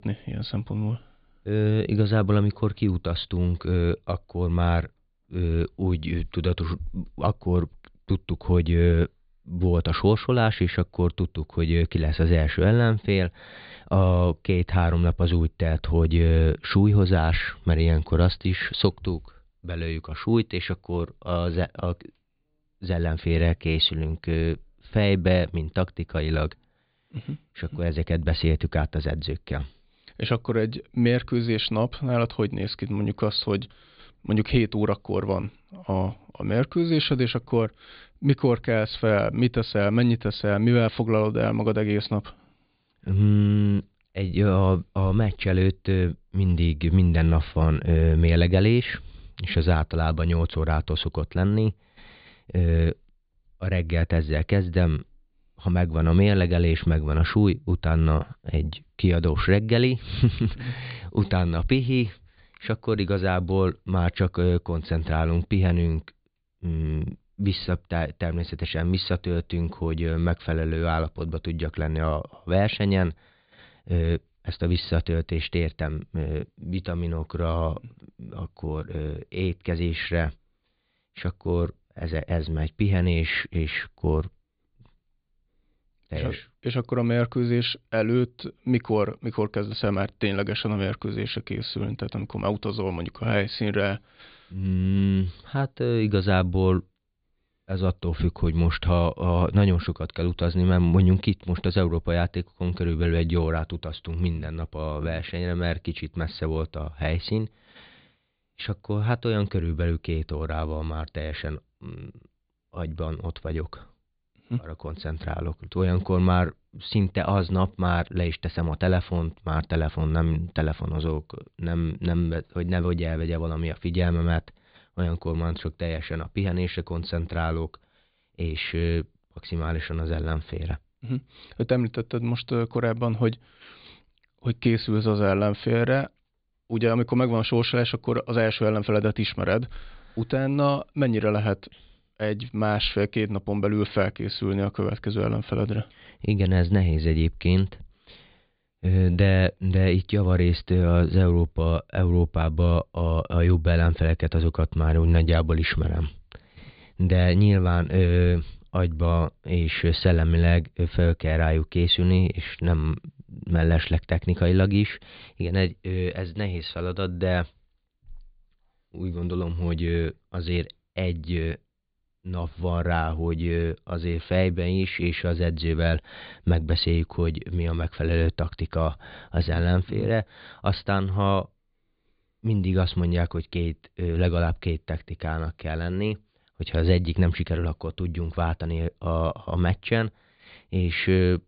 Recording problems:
high frequencies cut off; severe; nothing above 4.5 kHz

